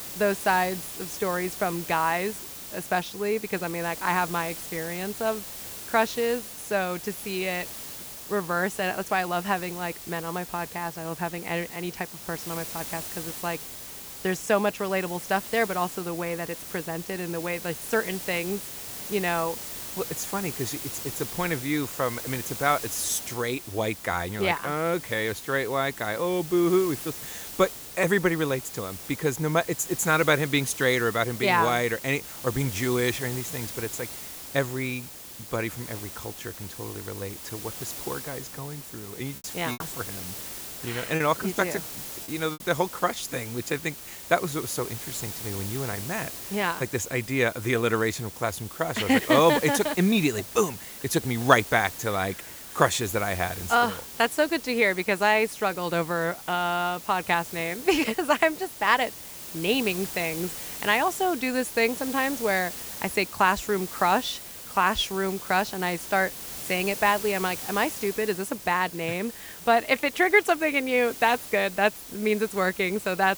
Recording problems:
hiss; loud; throughout; 10 dB below the speech
choppy; very; from 39 to 43 s; 7% of the speech affected

